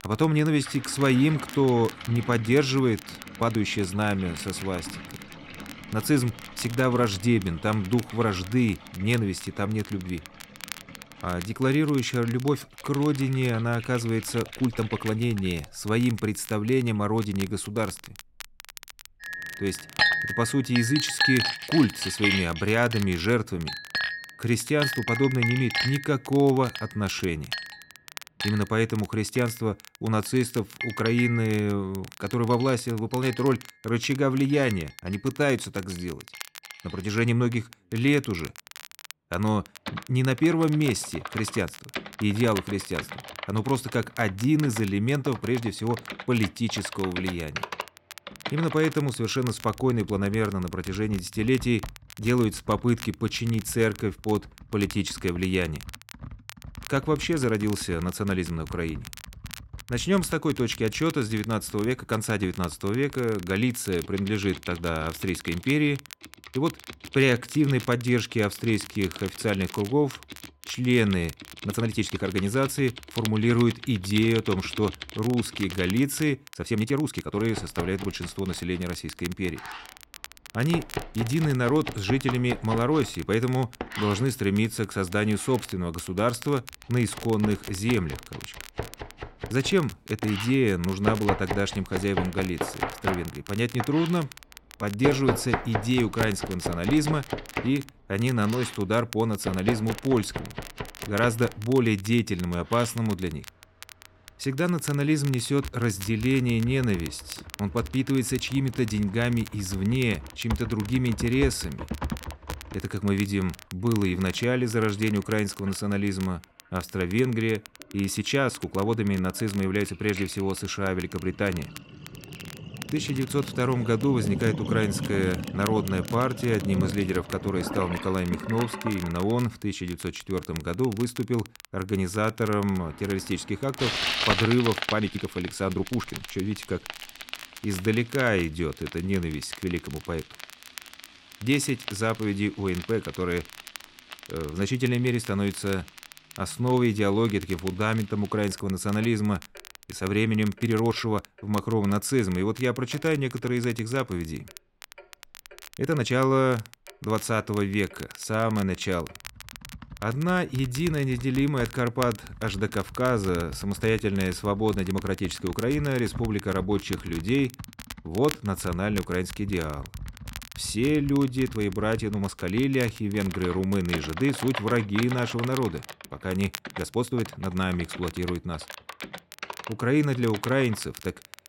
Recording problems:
household noises; loud; throughout; 9 dB below the speech
crackle, like an old record; noticeable; 20 dB below the speech
uneven, jittery; strongly; from 3.5 s to 2:58

